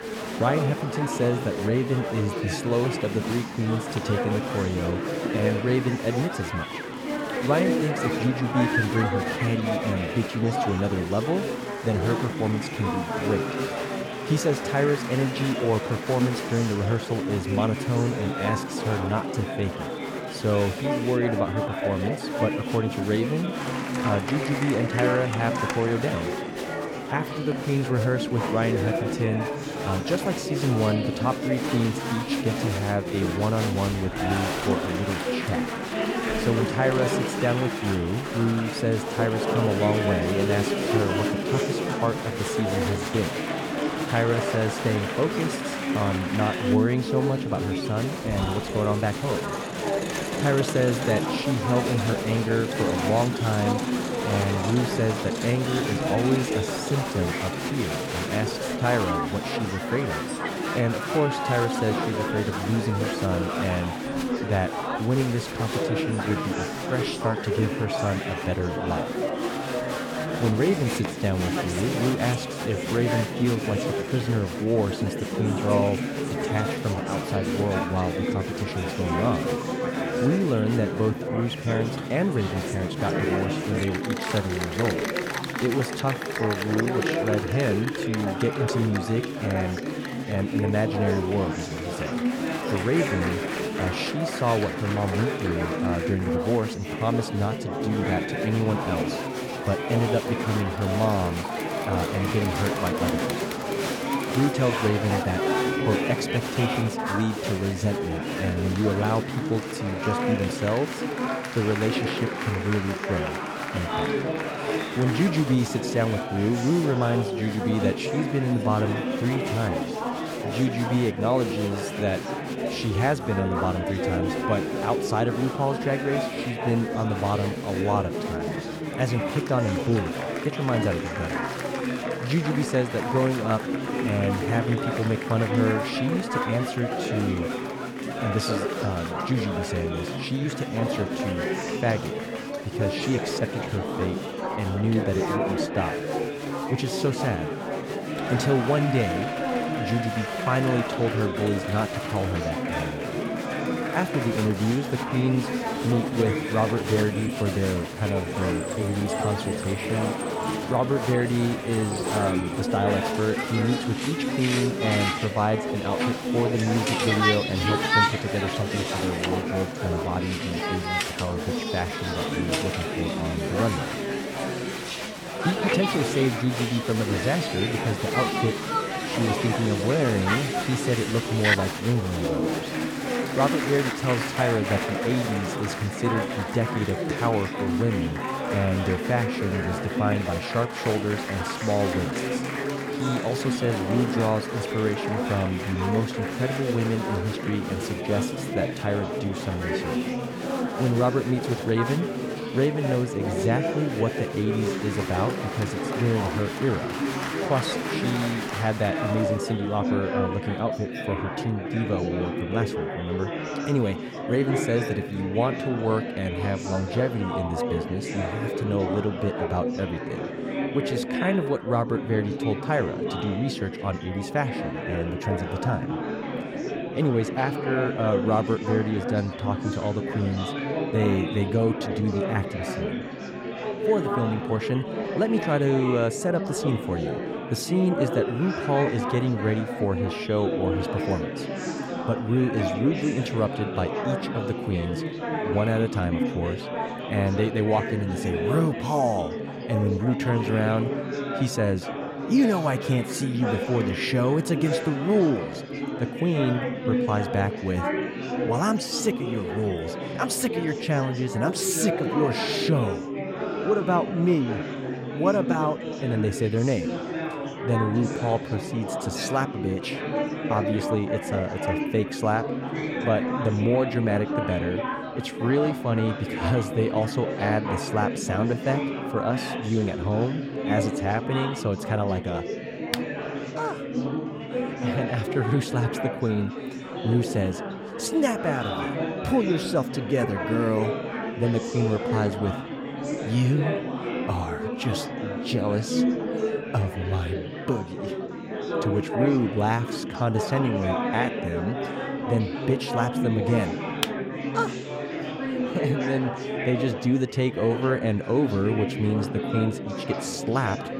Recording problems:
chatter from many people; loud; throughout; 2 dB below the speech

